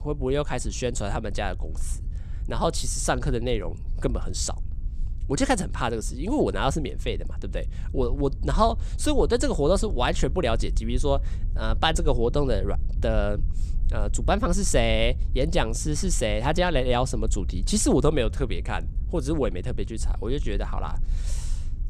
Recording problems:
low rumble; faint; throughout; 25 dB below the speech

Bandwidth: 14.5 kHz